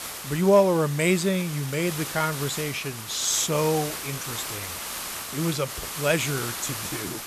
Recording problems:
hiss; loud; throughout; 7 dB below the speech

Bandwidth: 14 kHz